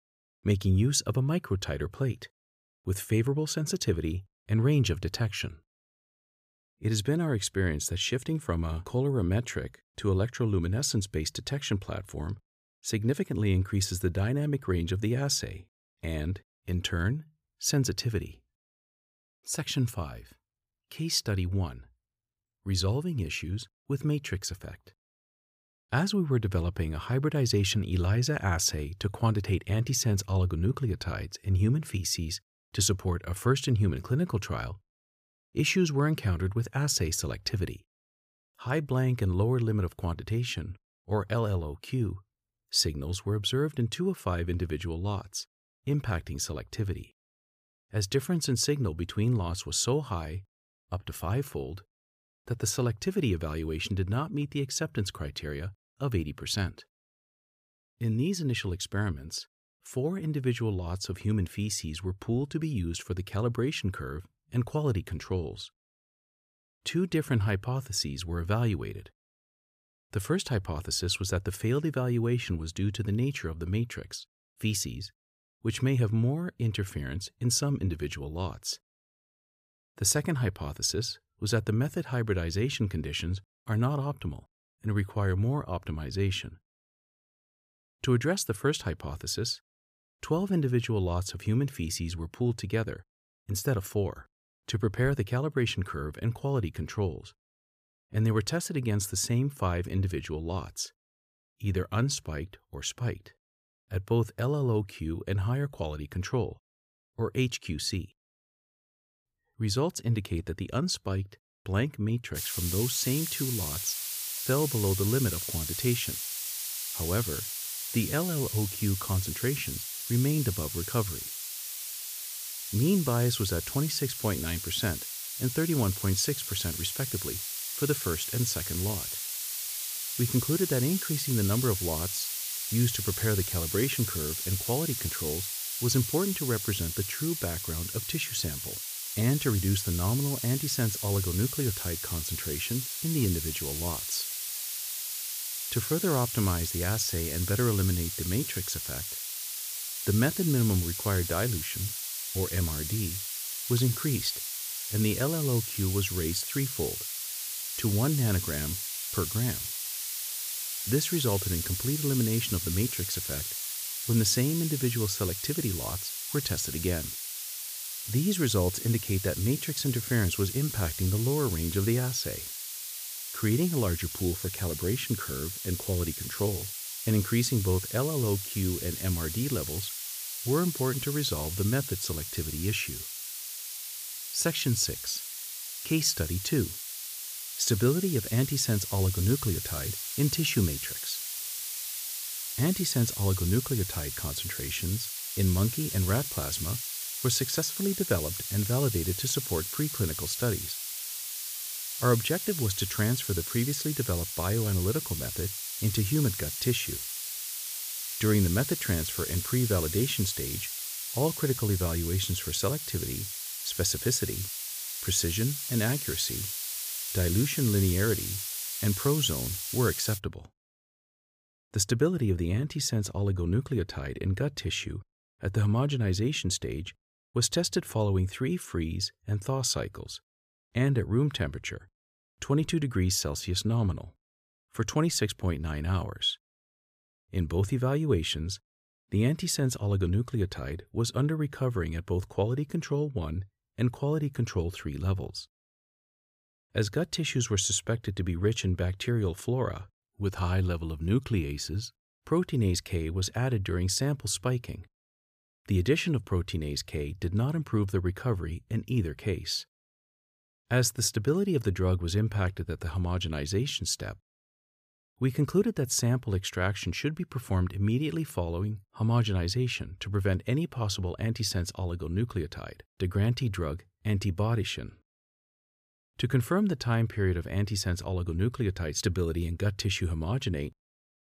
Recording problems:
hiss; loud; from 1:52 to 3:40; 3 dB below the speech

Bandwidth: 15 kHz